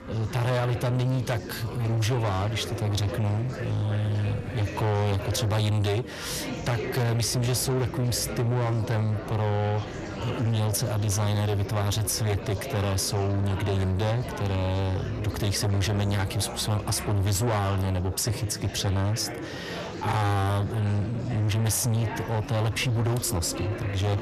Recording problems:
distortion; heavy; 7 dB below the speech
chatter from many people; loud; throughout; 9 dB below the speech

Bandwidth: 13.5 kHz